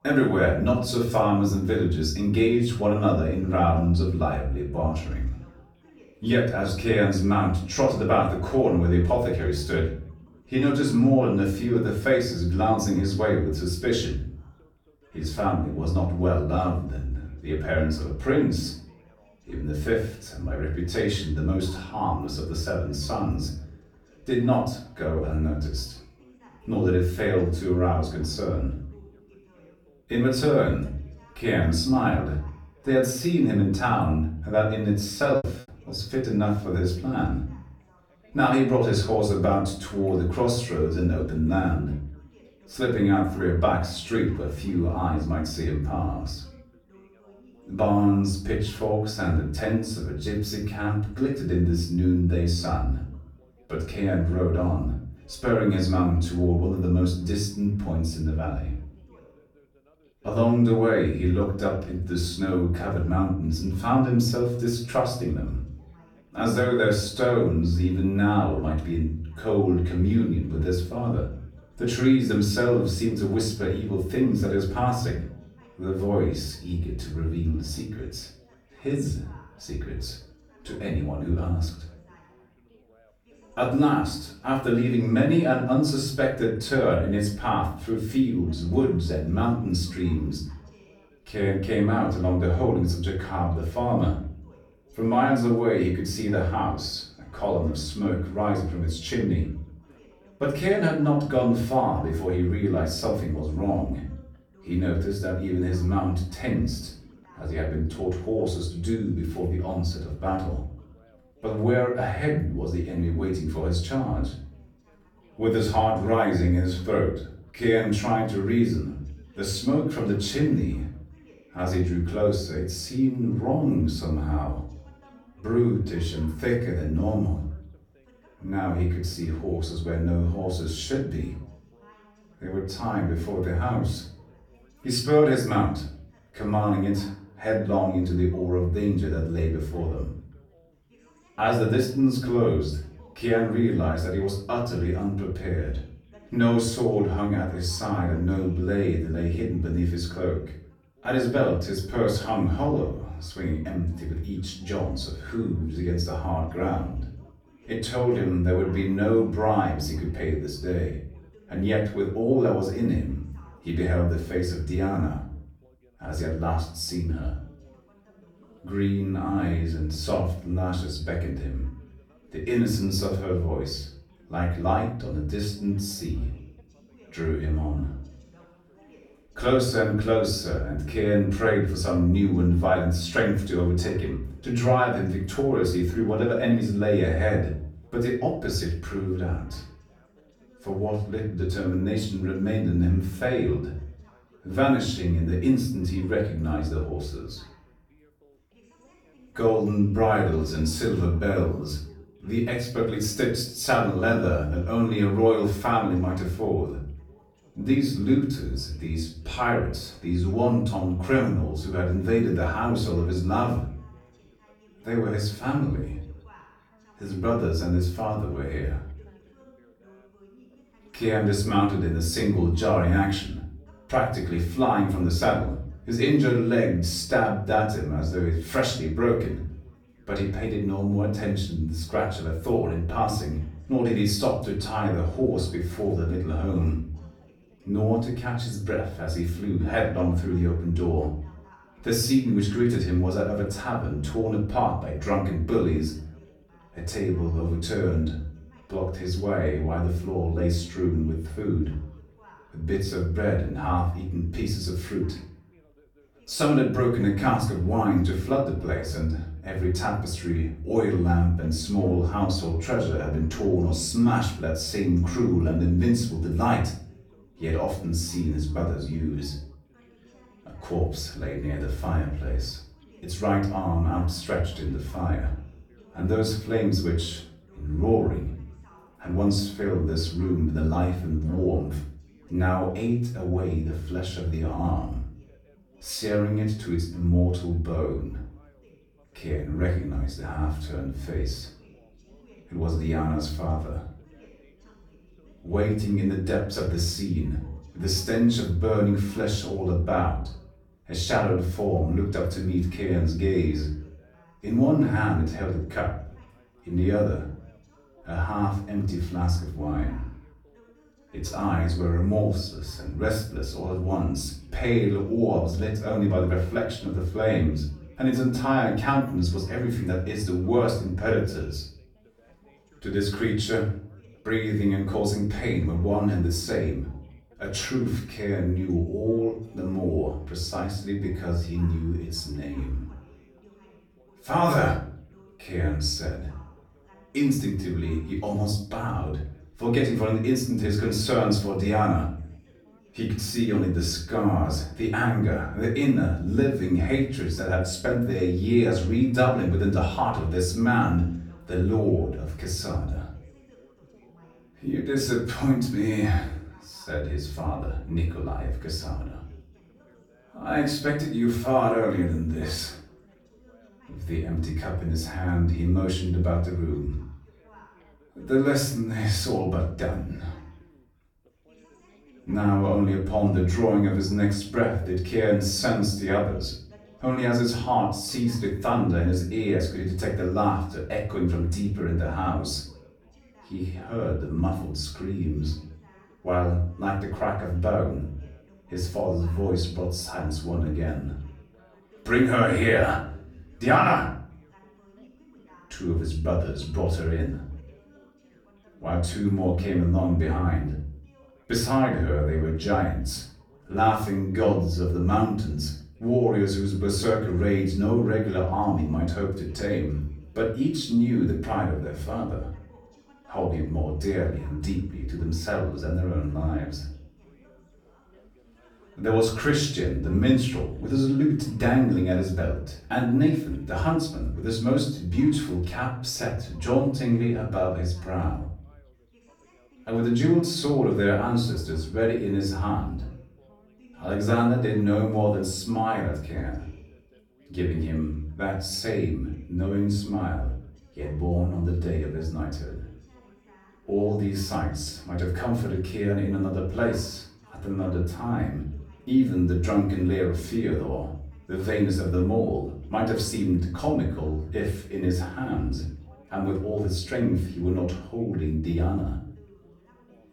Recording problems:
off-mic speech; far
room echo; noticeable; dies away in 0.5 s
background chatter; faint; throughout; 3 voices, 30 dB below the speech
choppy; very; at 35 s; 10% of the speech affected

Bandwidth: 18.5 kHz